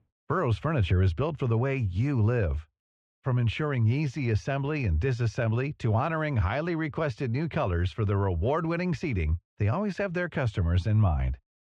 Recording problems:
muffled; very; fading above 3 kHz

